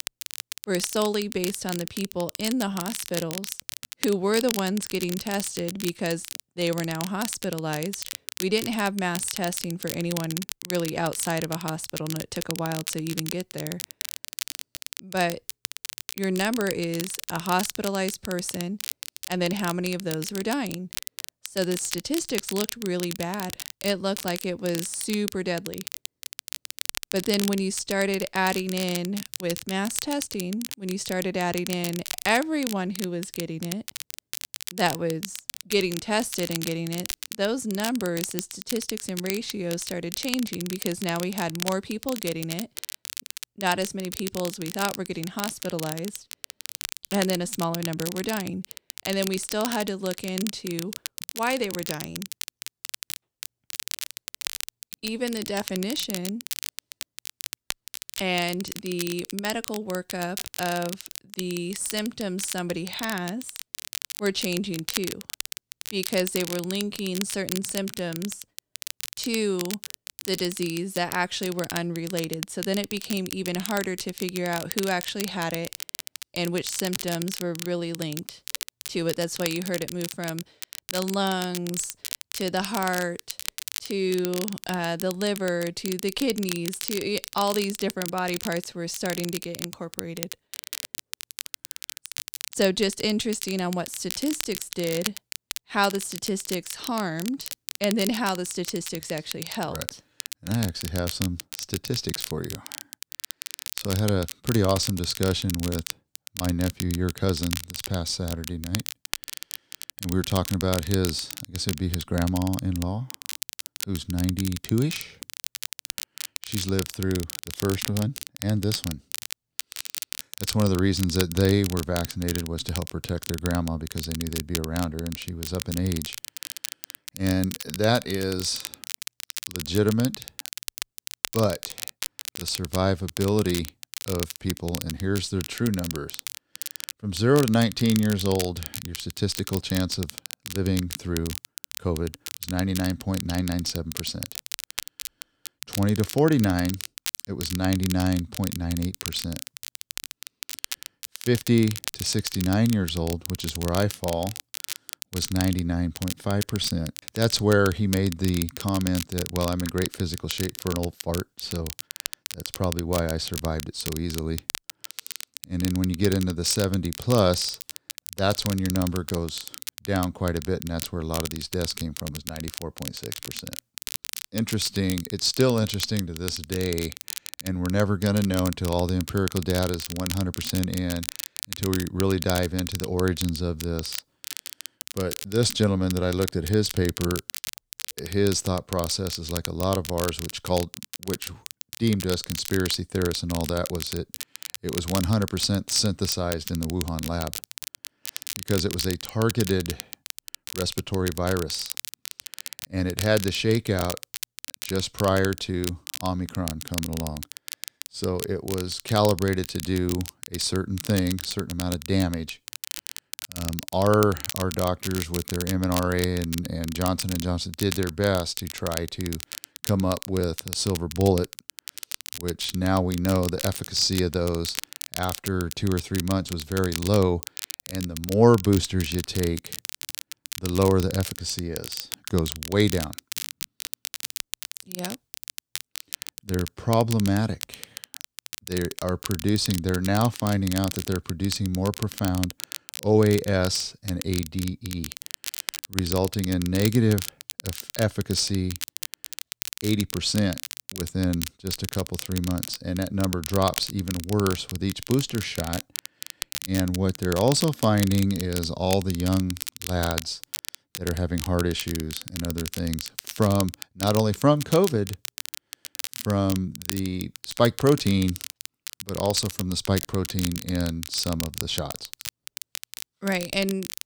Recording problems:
crackle, like an old record; loud; 8 dB below the speech

